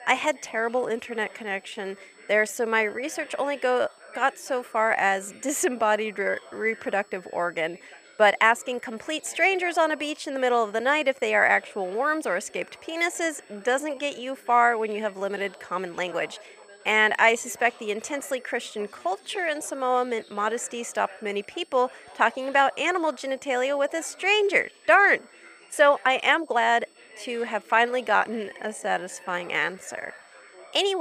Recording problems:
thin; somewhat; fading below 550 Hz
high-pitched whine; faint; throughout; 8 kHz, 35 dB below the speech
background chatter; faint; throughout; 3 voices, 25 dB below the speech
uneven, jittery; strongly; from 1 to 30 s
abrupt cut into speech; at the end

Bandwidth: 15 kHz